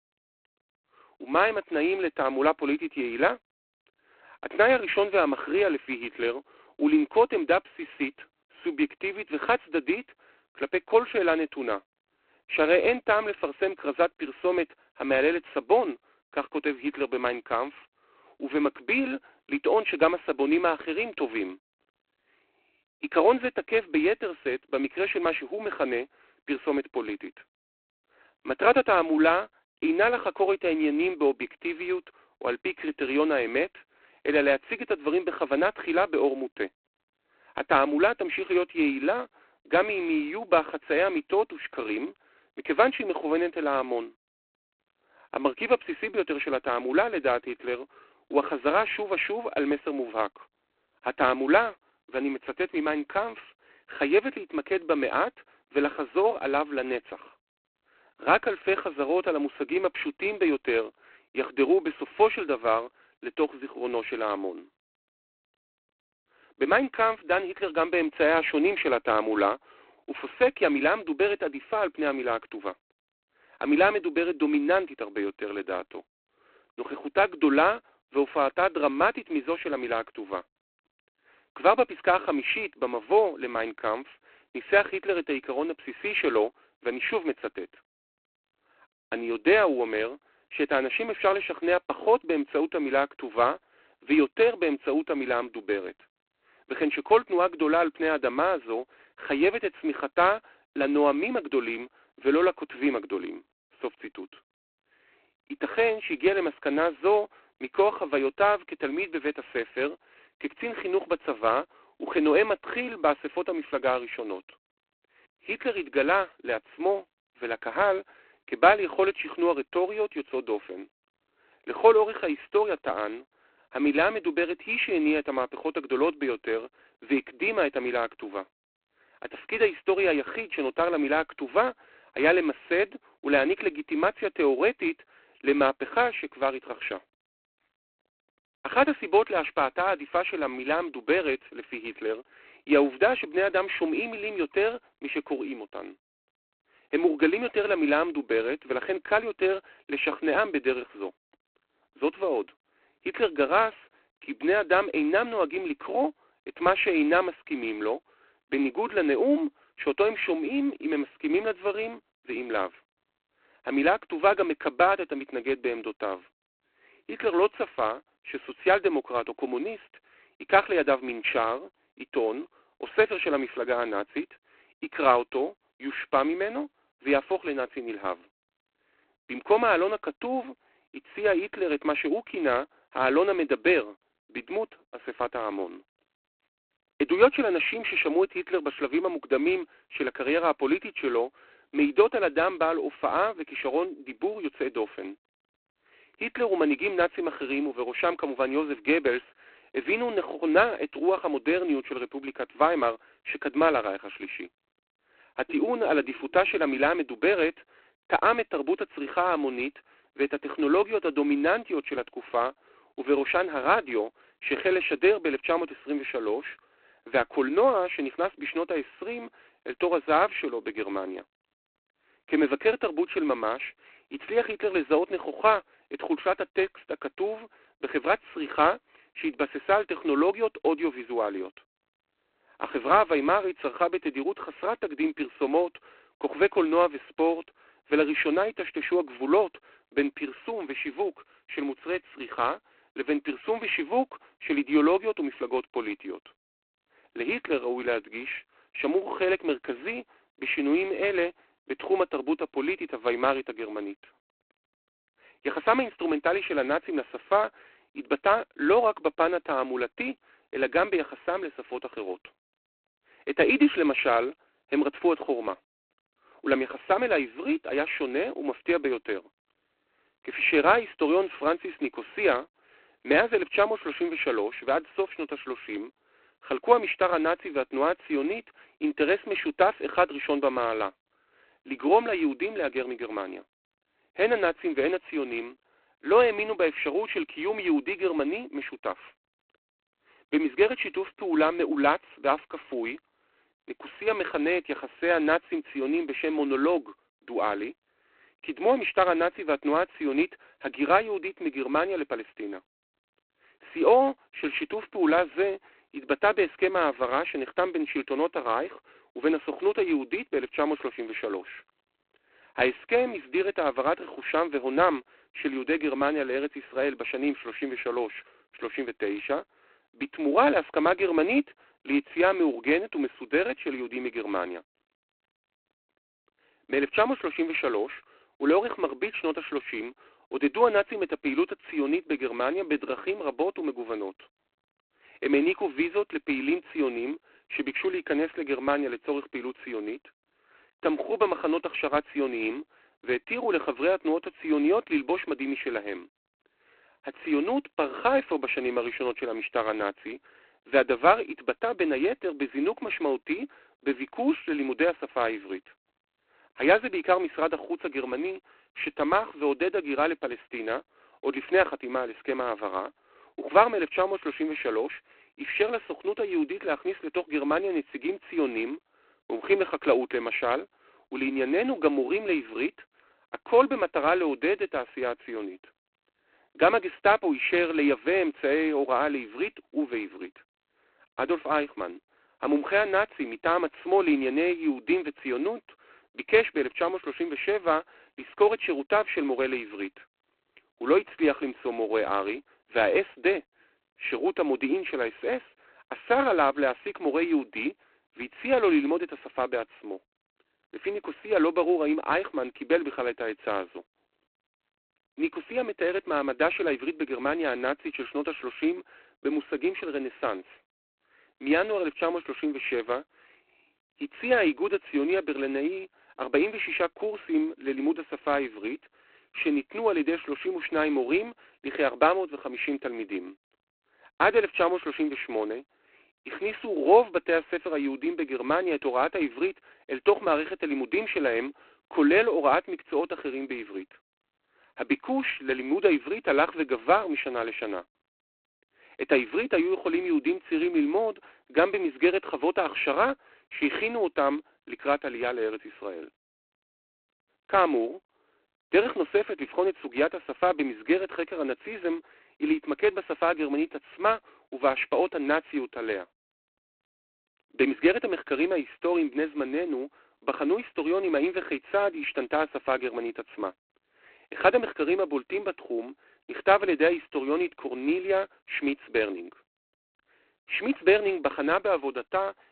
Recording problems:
phone-call audio; poor line; nothing above 4 kHz

